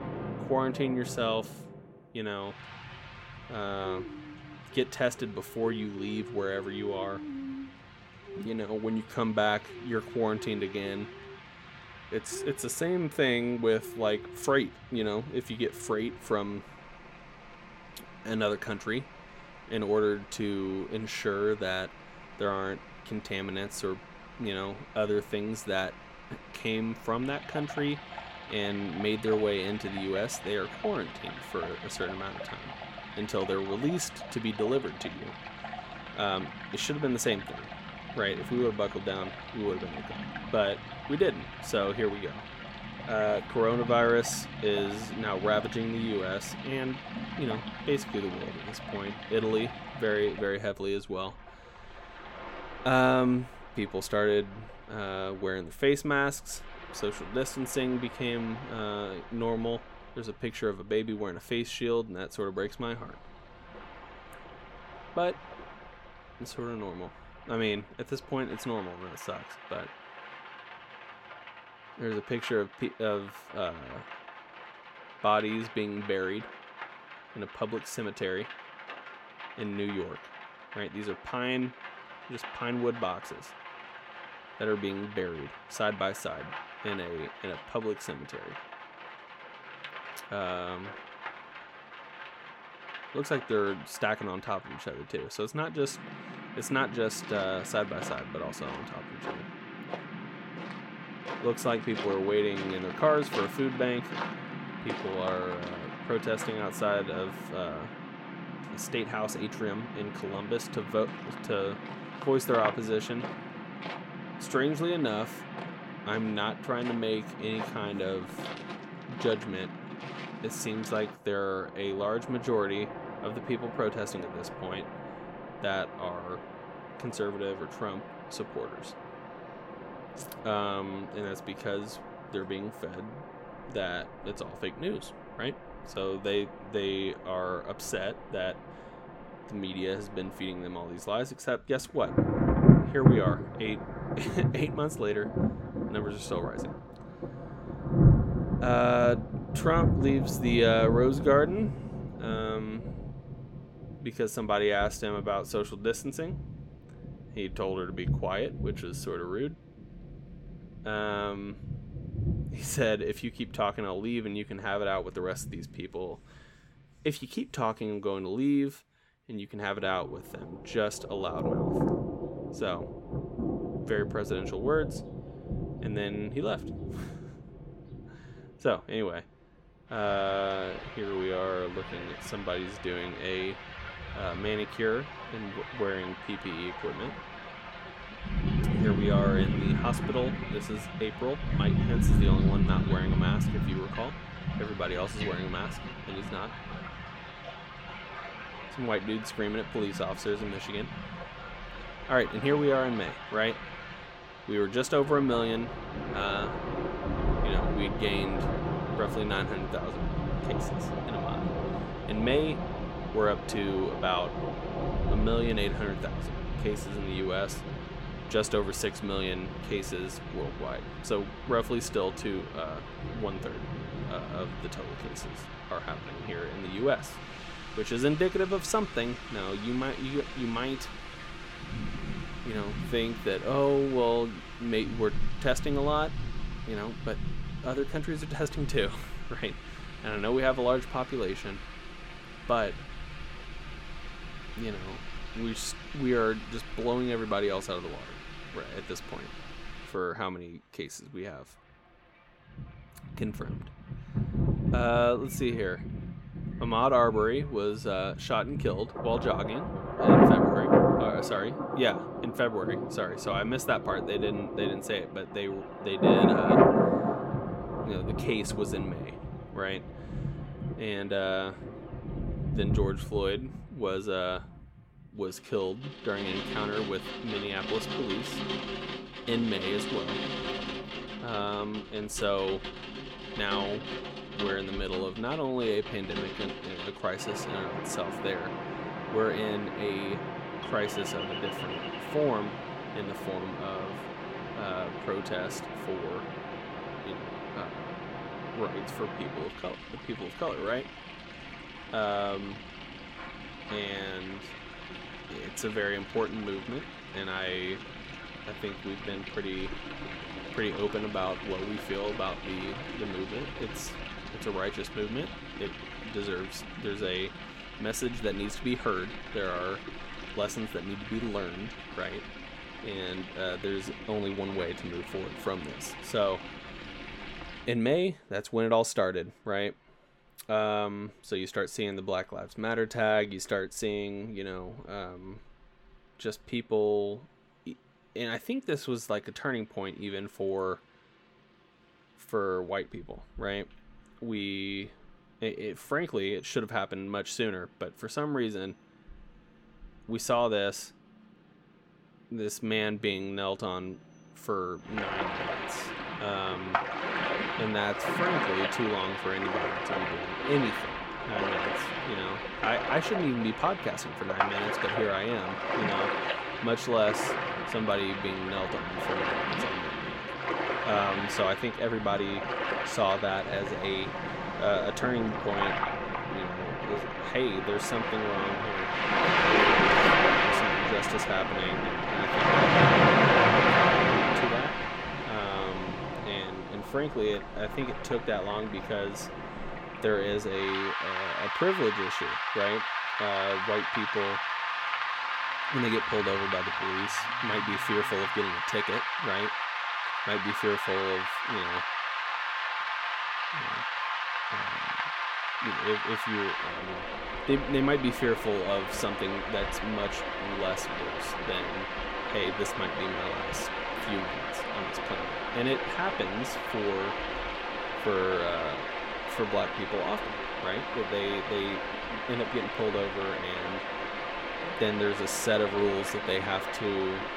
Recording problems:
rain or running water; loud; throughout; 1 dB below the speech

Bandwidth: 16.5 kHz